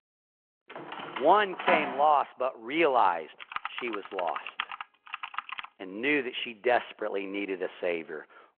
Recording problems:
phone-call audio
door banging; noticeable; from 1 to 2 s; peak level with the speech
keyboard typing; noticeable; from 3.5 to 5.5 s; peak 8 dB below the speech

